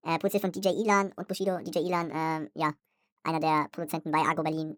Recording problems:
wrong speed and pitch; too fast and too high; 1.6 times normal speed

